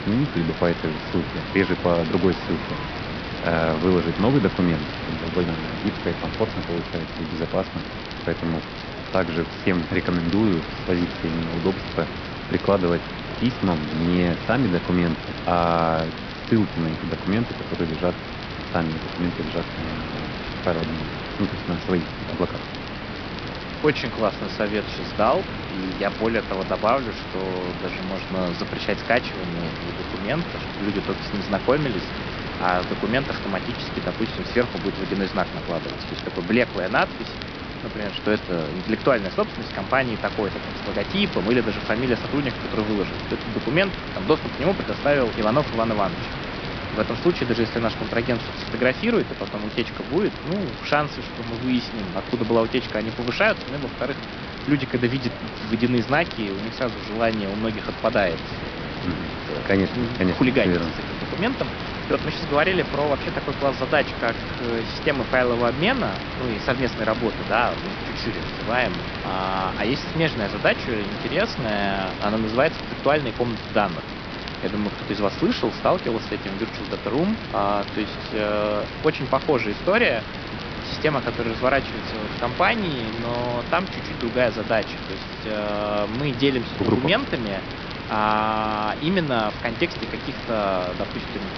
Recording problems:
high frequencies cut off; noticeable; nothing above 5.5 kHz
hiss; loud; throughout; 7 dB below the speech
murmuring crowd; noticeable; throughout; 20 dB below the speech
crackle, like an old record; noticeable; 15 dB below the speech

